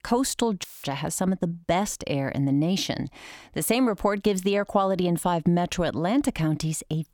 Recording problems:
audio cutting out; filled with static; at 0.5 s

